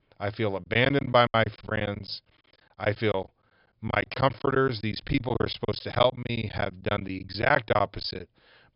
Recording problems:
high frequencies cut off; noticeable; nothing above 5.5 kHz
choppy; very; 18% of the speech affected

